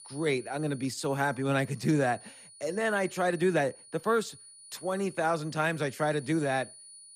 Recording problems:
high-pitched whine; noticeable; throughout; 9.5 kHz, 20 dB below the speech

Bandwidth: 14.5 kHz